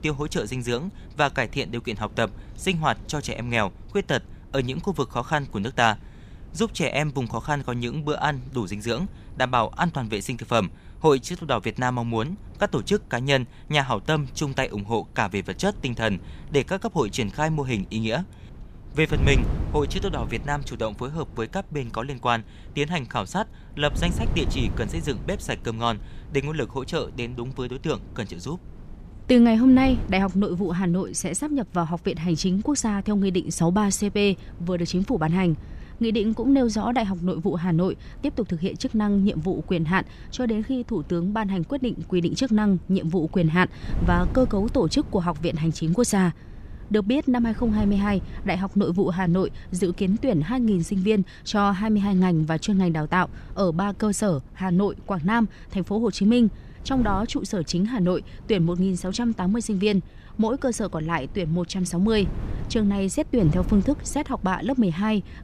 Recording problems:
wind noise on the microphone; occasional gusts; 20 dB below the speech

